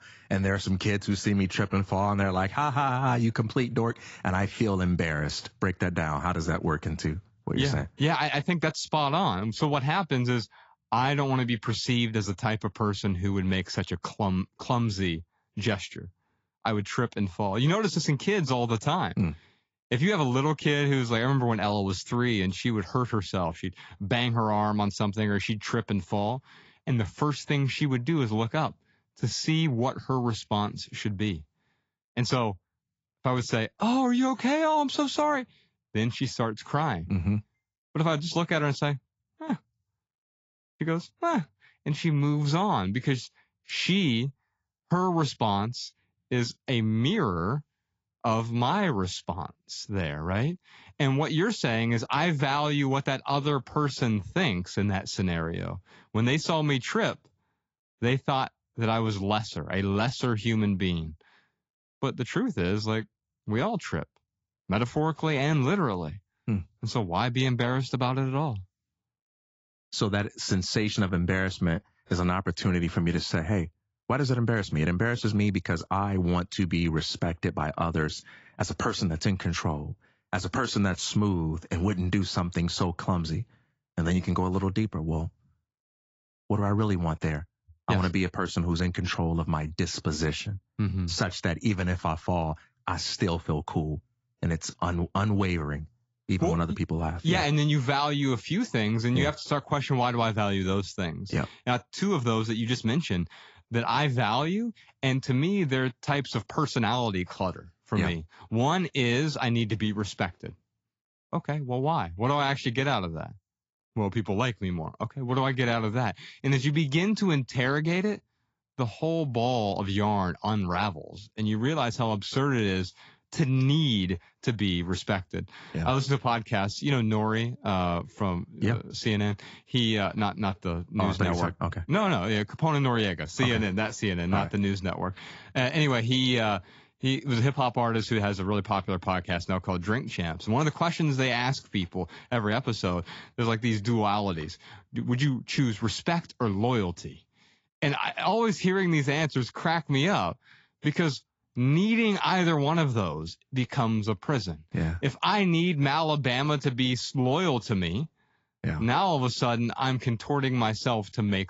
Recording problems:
high frequencies cut off; noticeable; nothing above 7.5 kHz
garbled, watery; slightly

